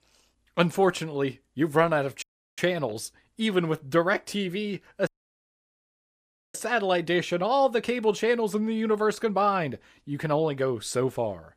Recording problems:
audio cutting out; at 2 s and at 5 s for 1.5 s

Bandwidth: 15 kHz